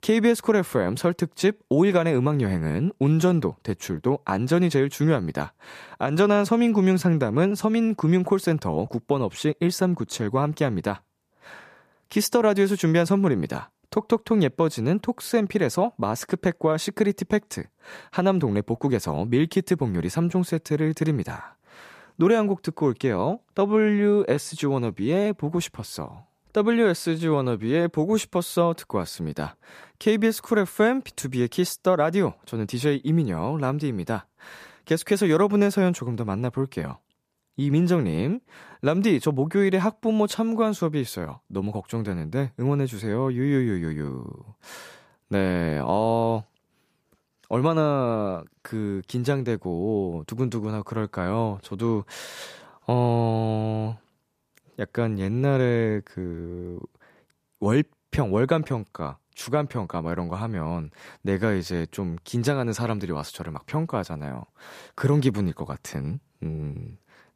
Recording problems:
none

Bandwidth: 14.5 kHz